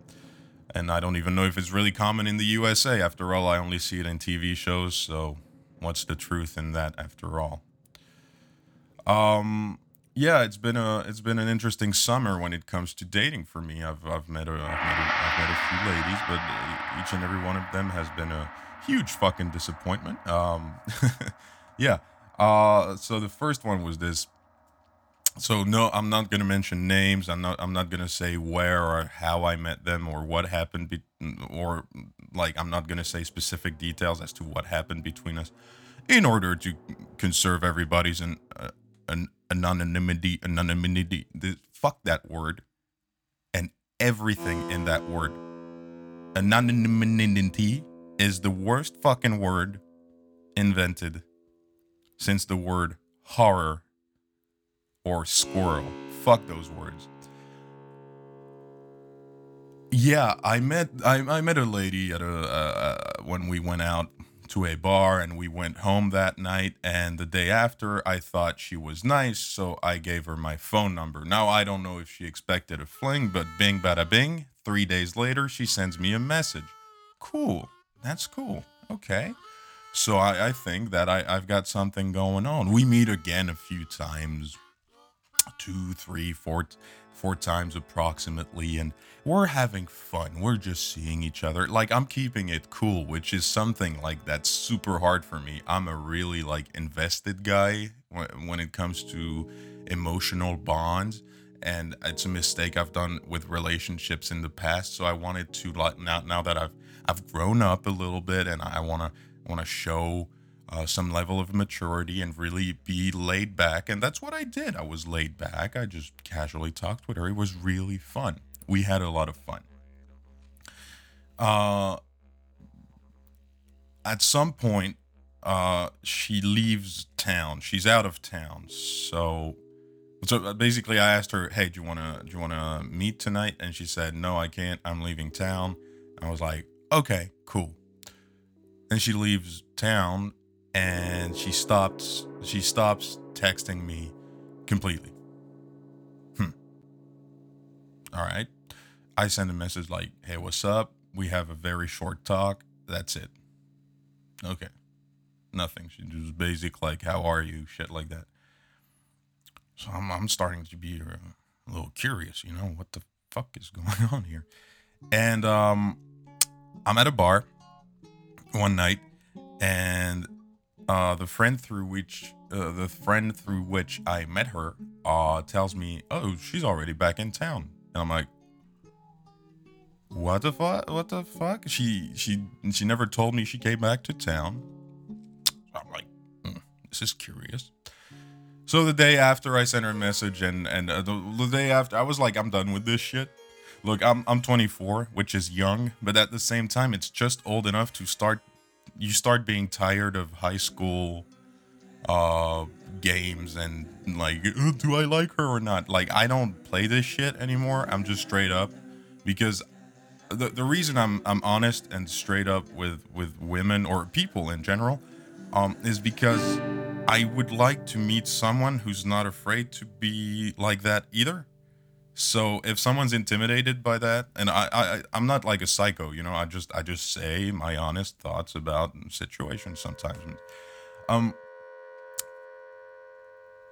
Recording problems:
background music; noticeable; throughout; 15 dB below the speech

